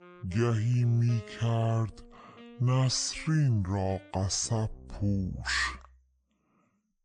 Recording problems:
wrong speed and pitch; too slow and too low; 0.6 times normal speed
background music; faint; throughout; 20 dB below the speech

